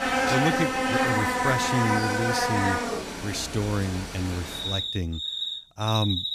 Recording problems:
animal sounds; very loud; throughout; 2 dB above the speech

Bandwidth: 14.5 kHz